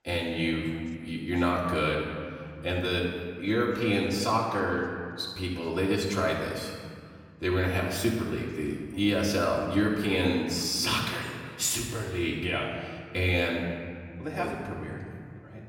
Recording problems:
off-mic speech; far
room echo; noticeable; dies away in 1.7 s
voice in the background; faint; throughout; 30 dB below the speech

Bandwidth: 17 kHz